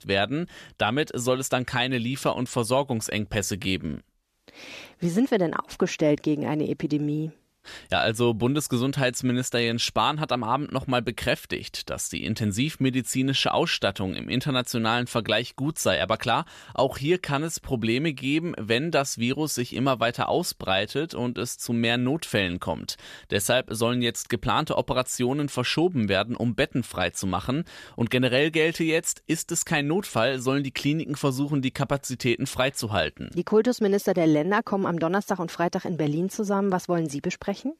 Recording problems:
none

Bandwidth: 14.5 kHz